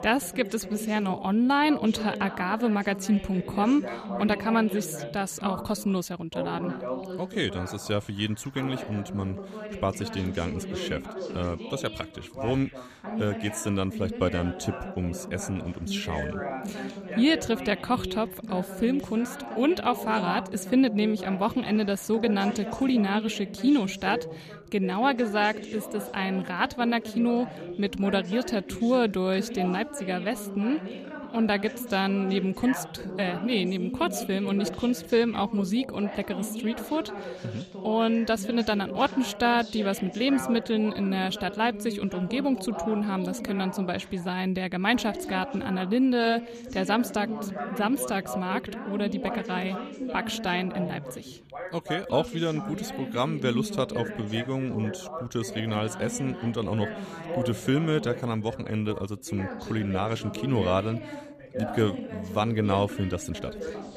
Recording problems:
background chatter; loud; throughout; 2 voices, 9 dB below the speech

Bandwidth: 14.5 kHz